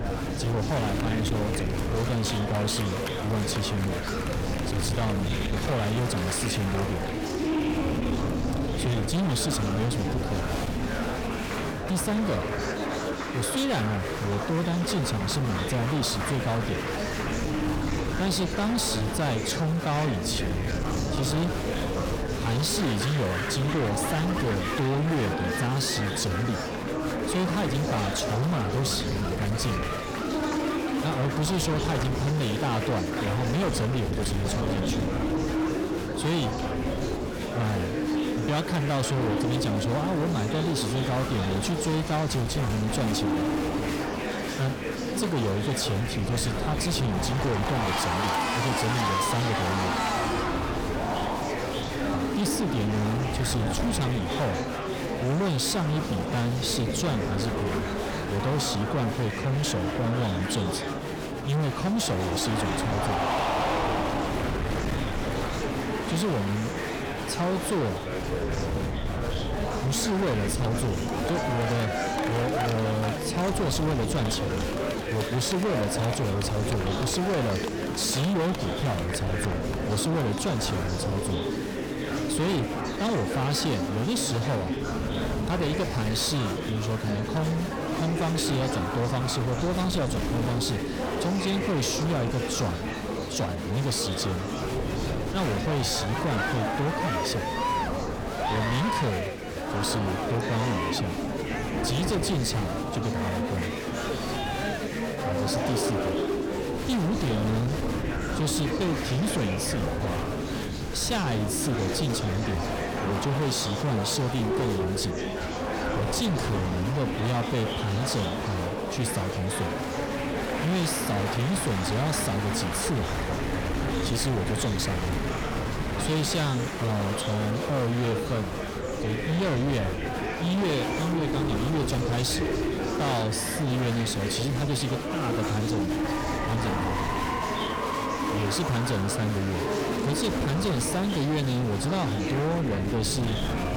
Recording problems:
distortion; heavy; 26% of the sound clipped
murmuring crowd; loud; throughout; 2 dB below the speech
wind noise on the microphone; occasional gusts; 10 dB below the speech

